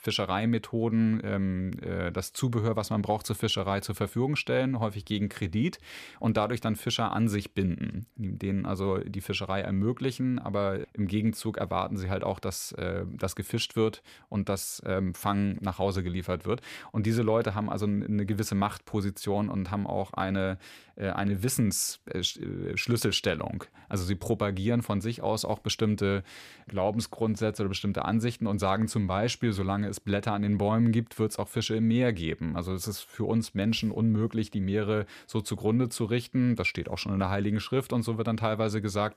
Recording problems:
none

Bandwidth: 15 kHz